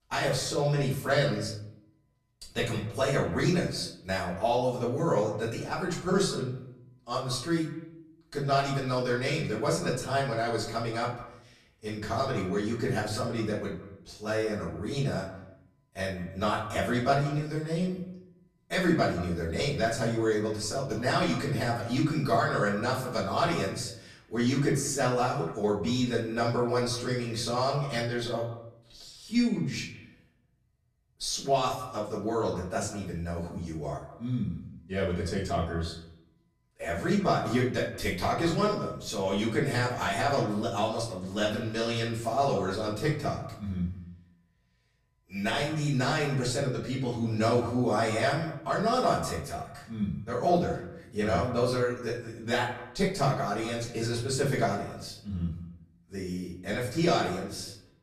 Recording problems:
off-mic speech; far
echo of what is said; noticeable; throughout; 170 ms later, 15 dB below the speech
room echo; slight; dies away in 0.4 s

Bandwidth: 14 kHz